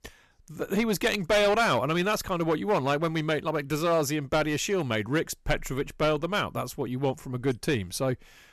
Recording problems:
distortion; slight; 6% of the sound clipped

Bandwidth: 13.5 kHz